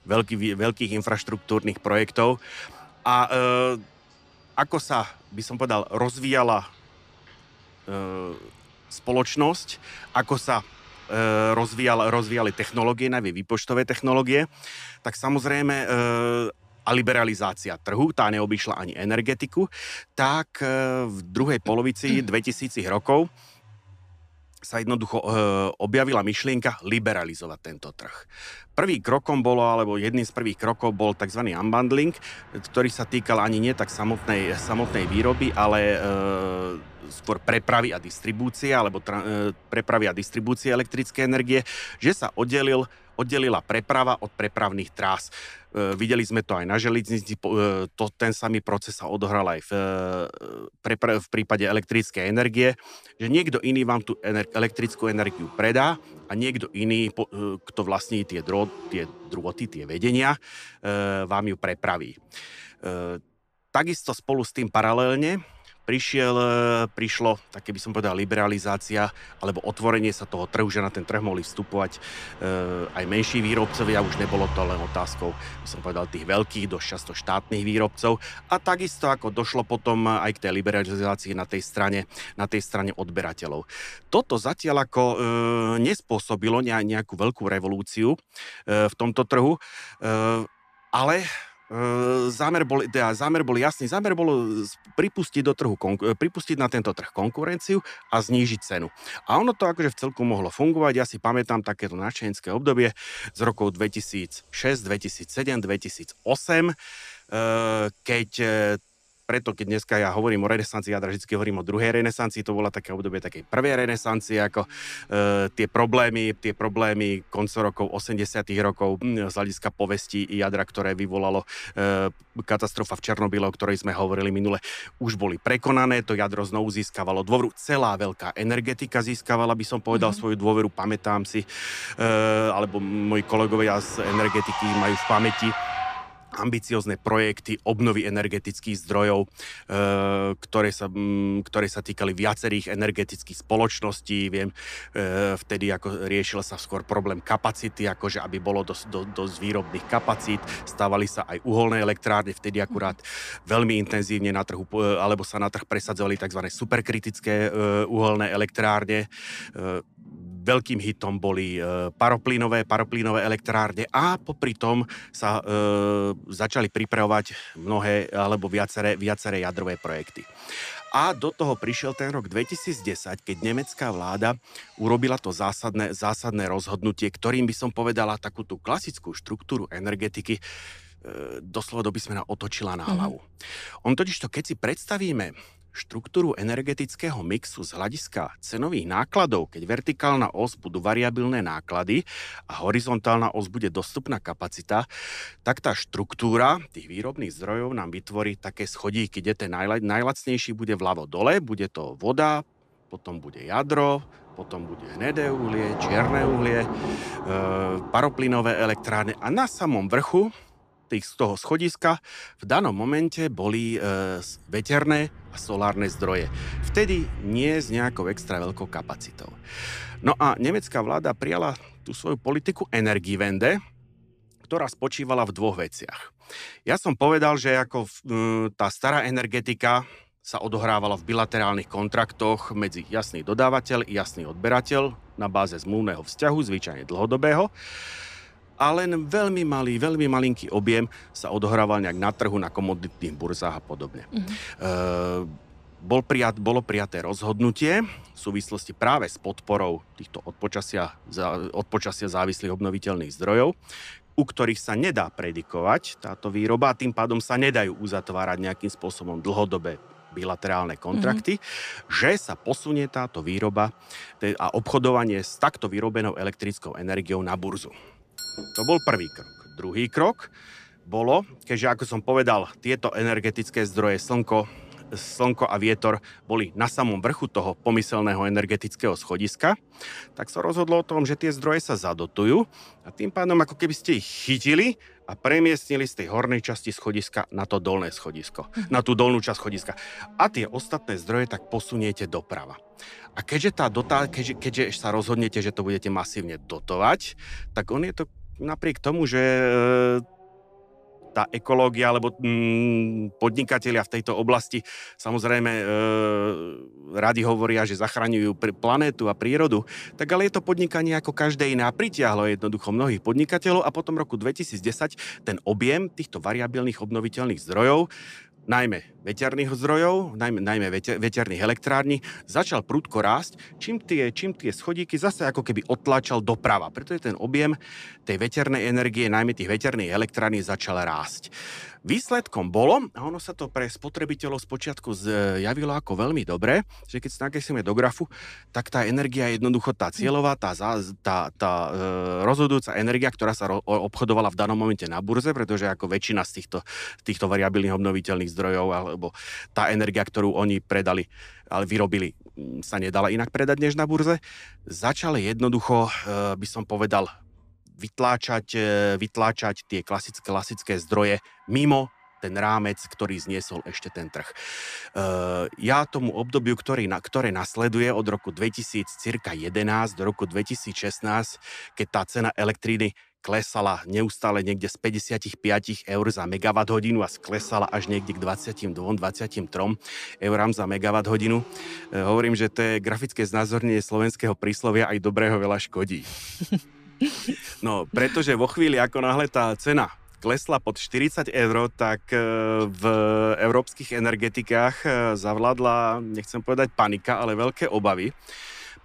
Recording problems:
traffic noise; noticeable; throughout; 15 dB below the speech
doorbell; noticeable; from 4:28 to 4:29; peak 4 dB below the speech

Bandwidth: 14.5 kHz